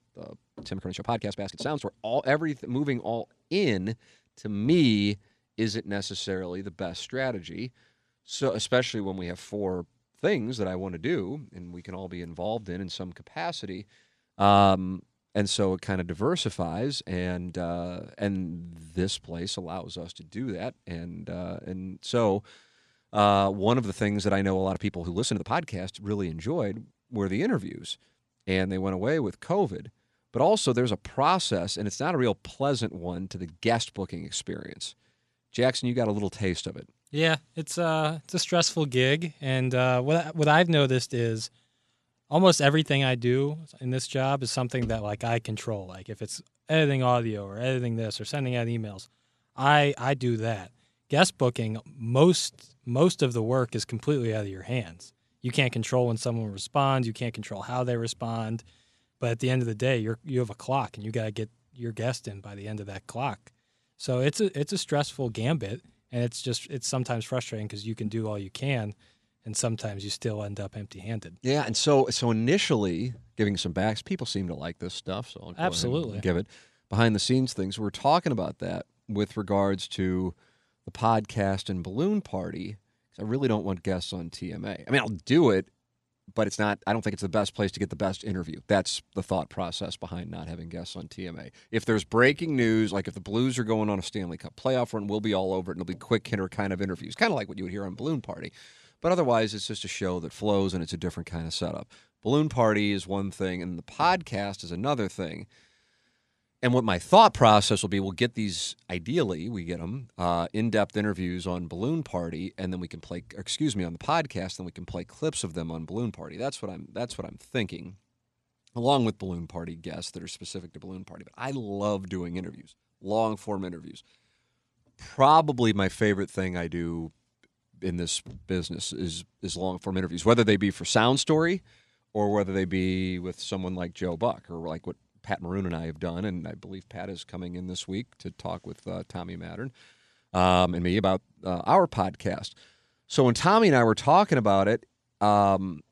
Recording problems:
uneven, jittery; strongly; from 0.5 s to 2:21

